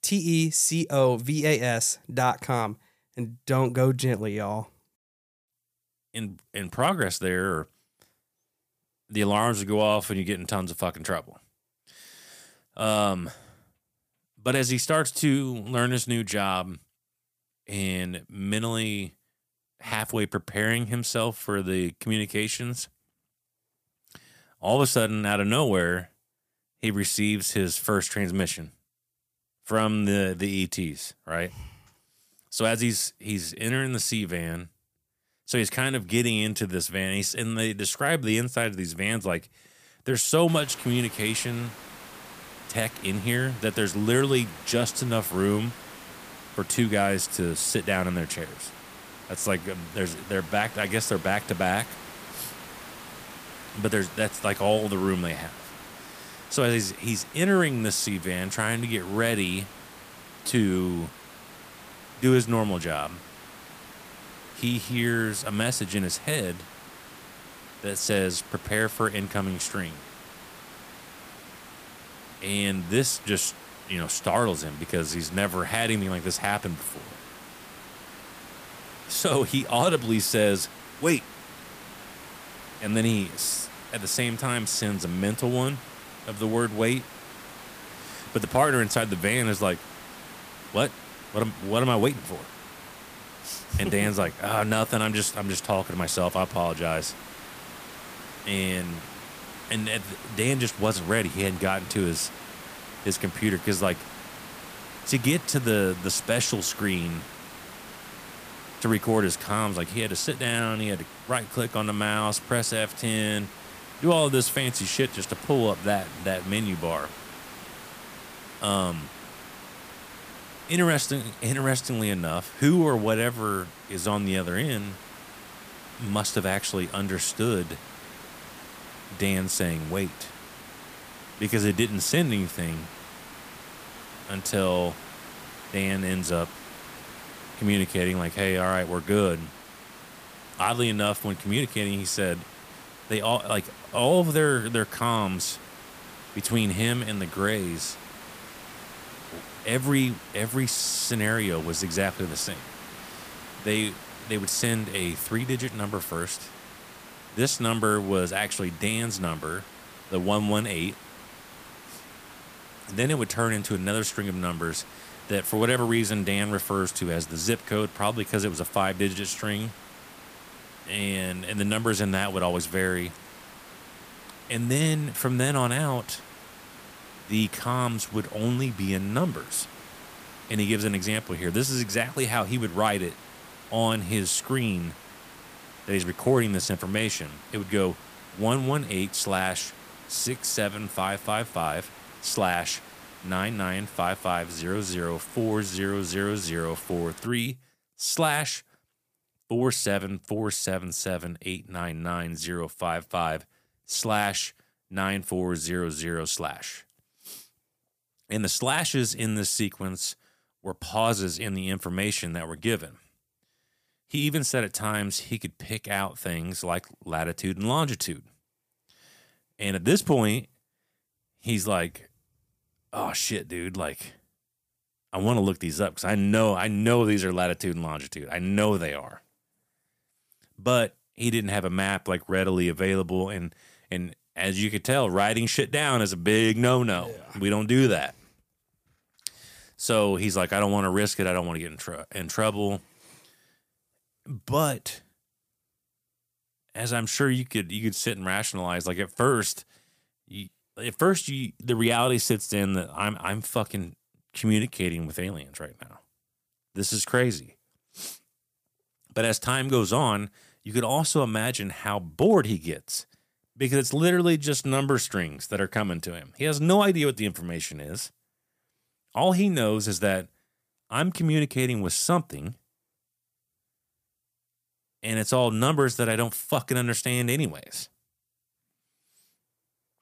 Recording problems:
hiss; noticeable; from 40 s to 3:17; 15 dB below the speech

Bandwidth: 15 kHz